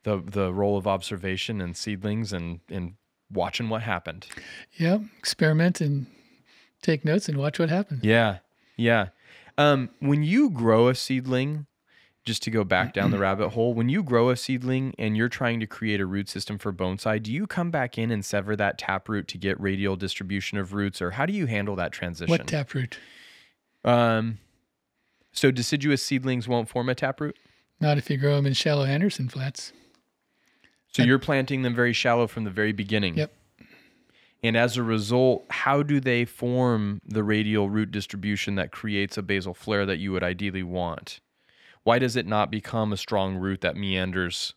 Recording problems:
none

